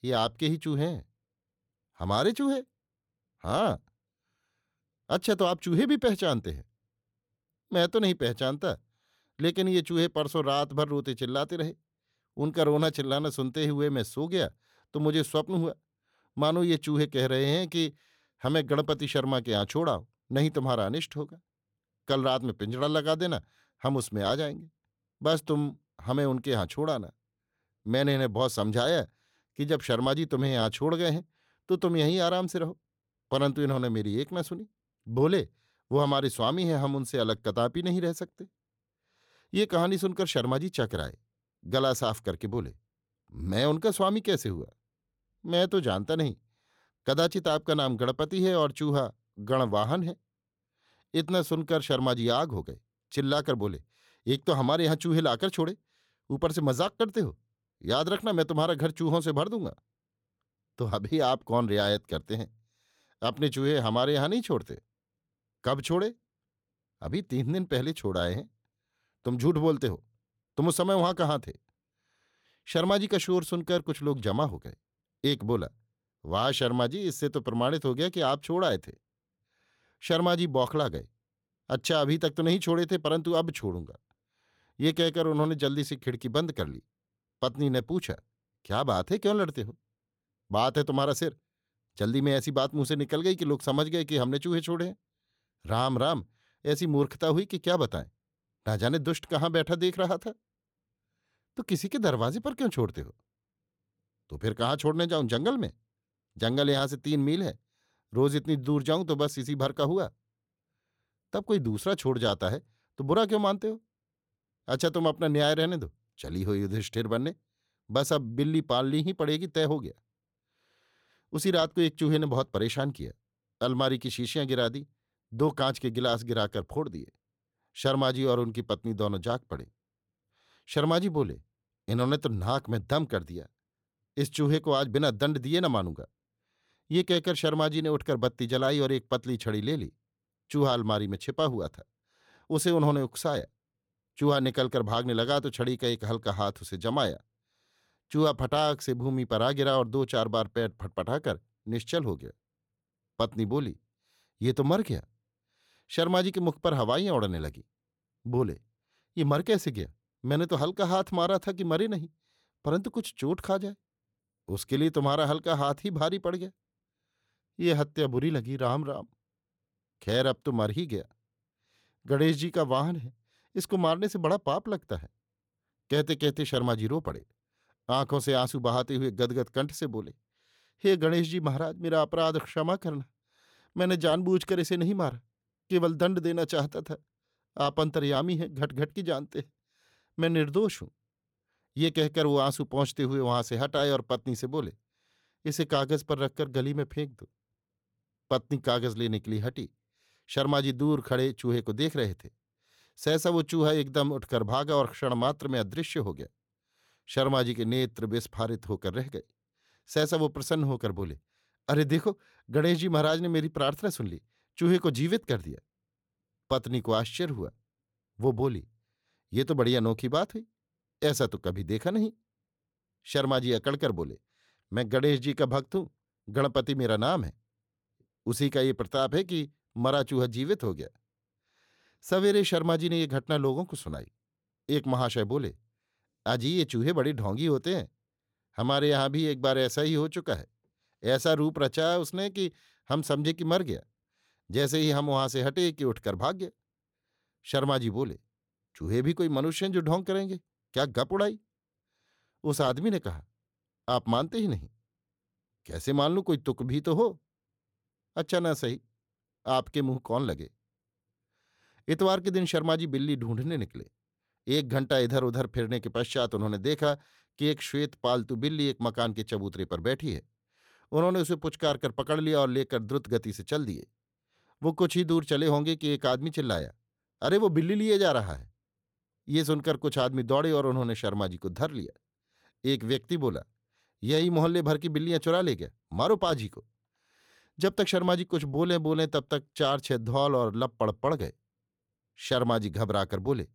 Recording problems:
none

